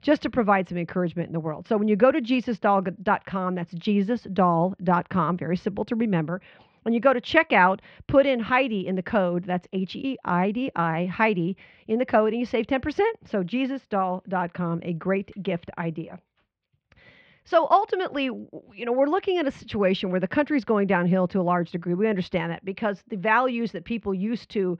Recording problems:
muffled; very; fading above 3 kHz

